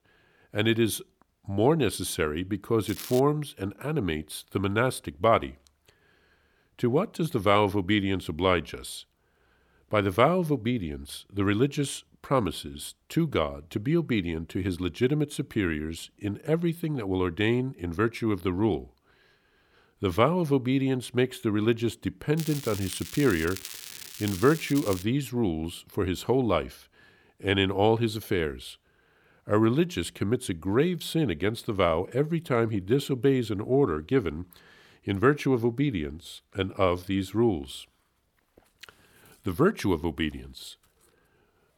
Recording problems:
crackling; noticeable; at 3 s and from 22 to 25 s; 10 dB below the speech

